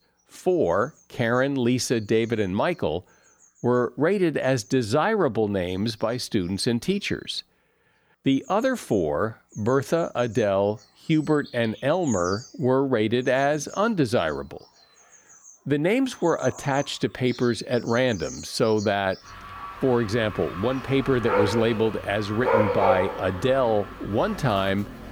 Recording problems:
animal sounds; loud; throughout; 7 dB below the speech

